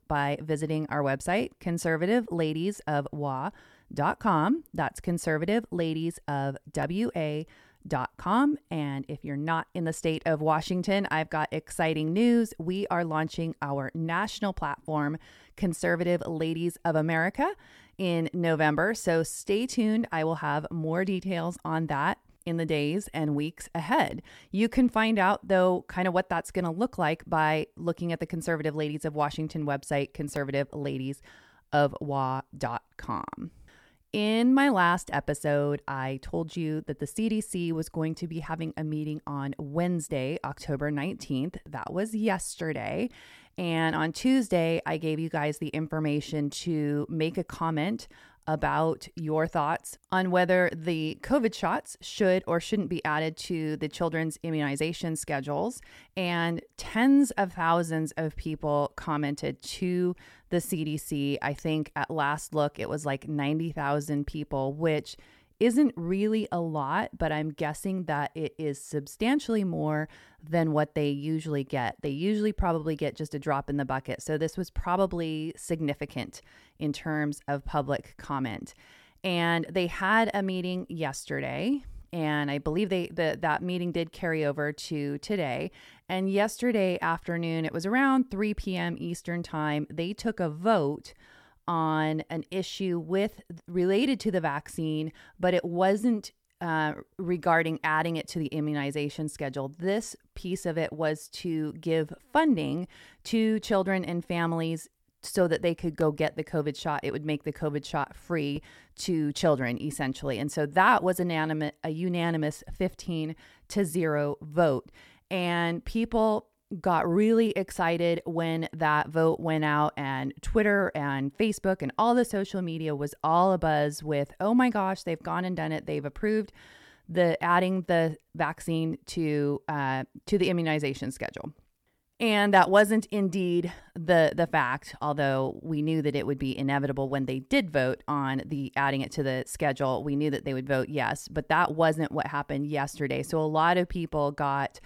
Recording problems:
none

